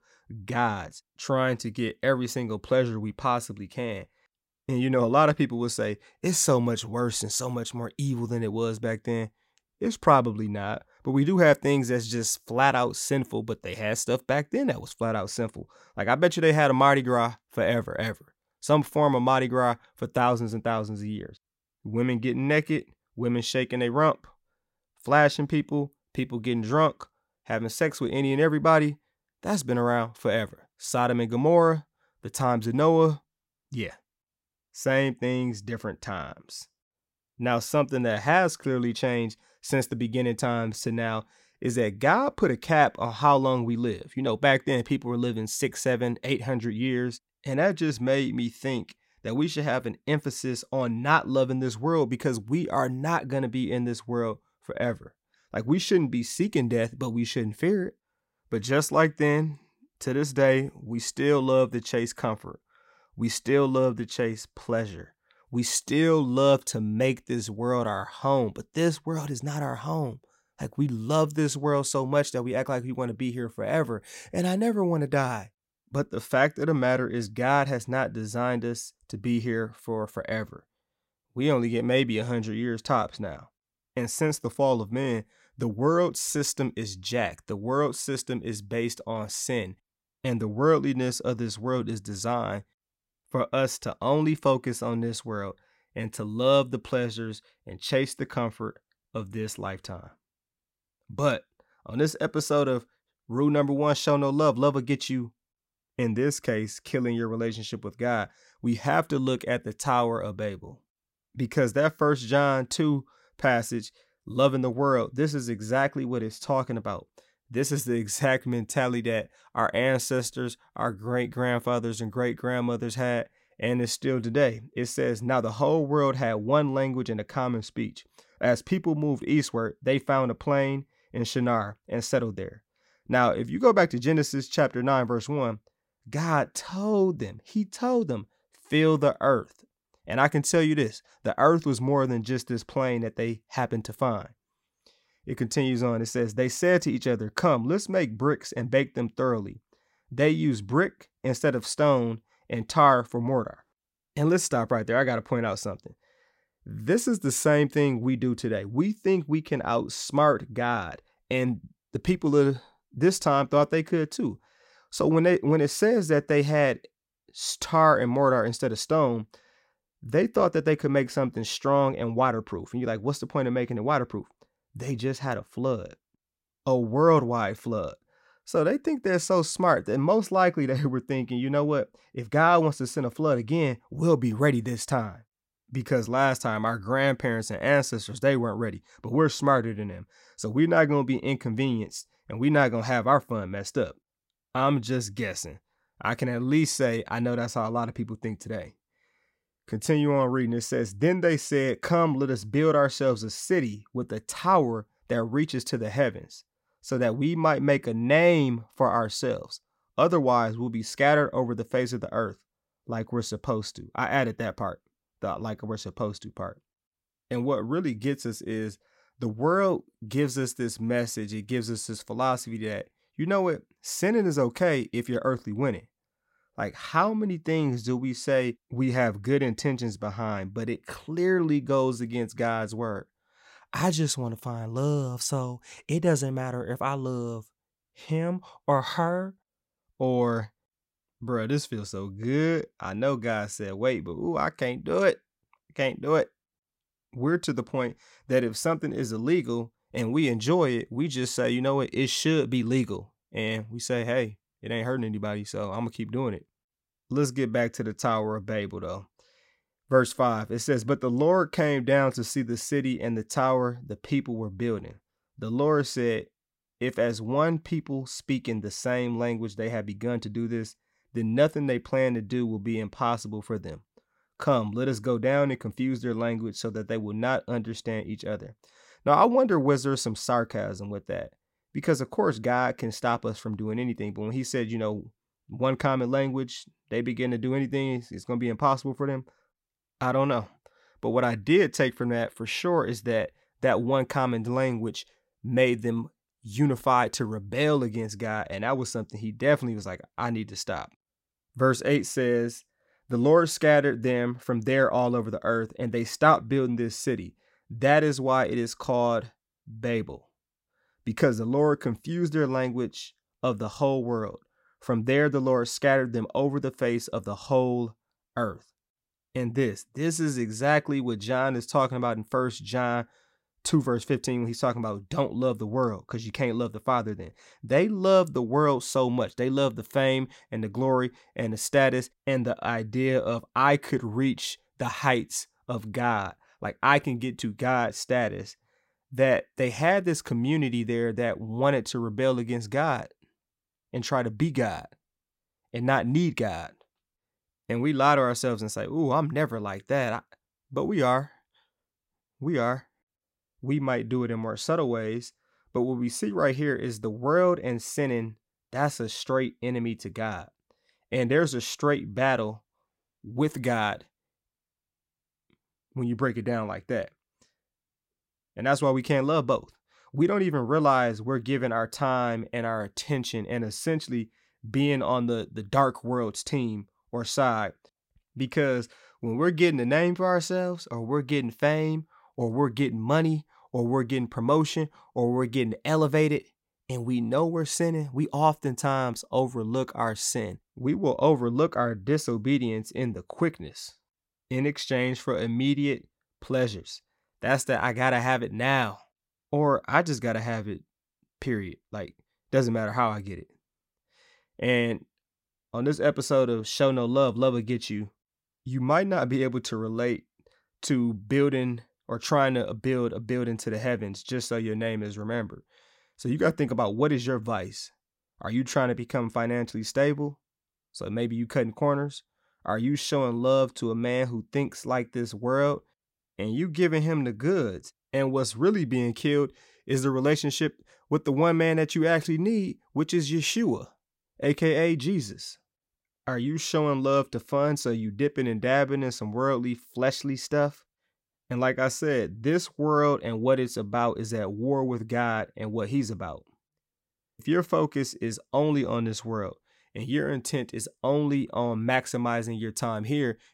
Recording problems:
none

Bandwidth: 16 kHz